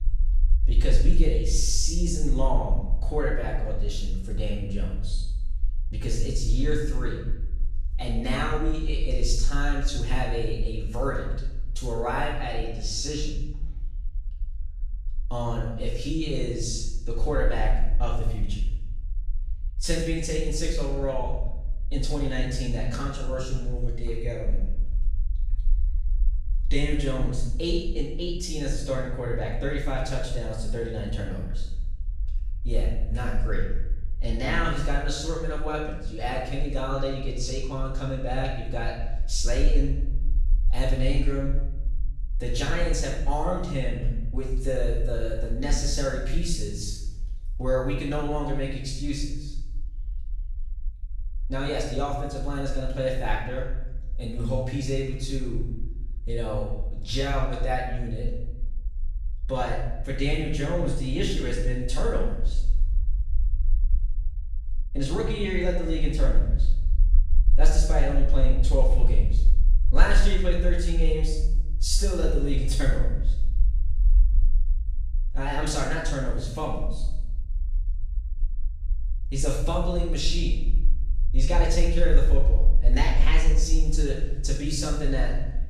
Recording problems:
off-mic speech; far
room echo; noticeable; dies away in 0.8 s
low rumble; faint; throughout; 25 dB below the speech

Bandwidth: 14.5 kHz